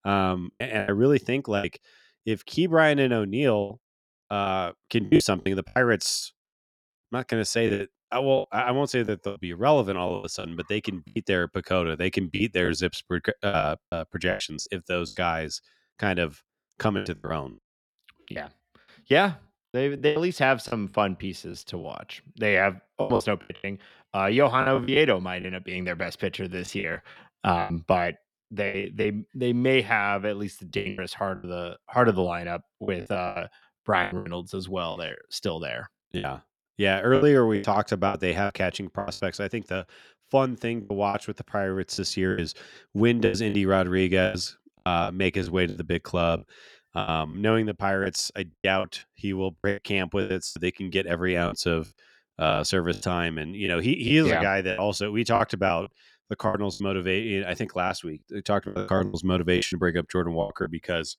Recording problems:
choppy; very; 12% of the speech affected

